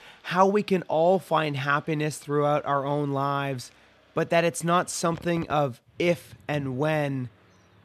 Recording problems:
traffic noise; faint; throughout; 25 dB below the speech

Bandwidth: 14 kHz